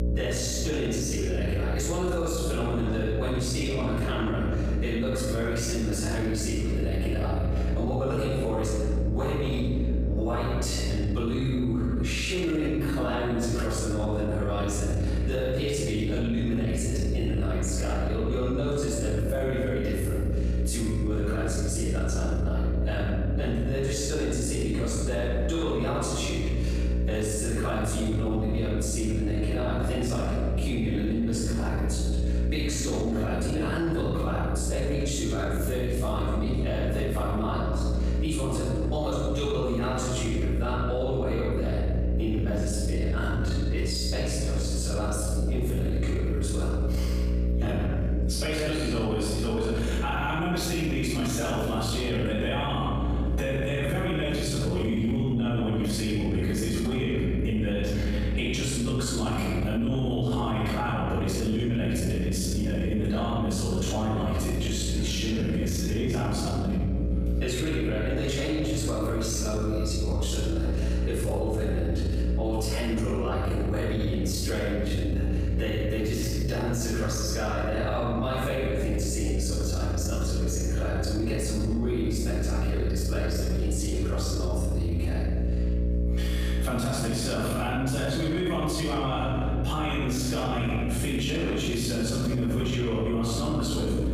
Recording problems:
room echo; strong; dies away in 1.5 s
off-mic speech; far
squashed, flat; somewhat
electrical hum; noticeable; throughout; 60 Hz, 10 dB below the speech

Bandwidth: 15 kHz